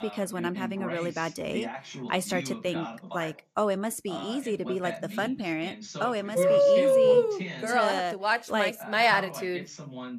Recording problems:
voice in the background; noticeable; throughout; 10 dB below the speech

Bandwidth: 14.5 kHz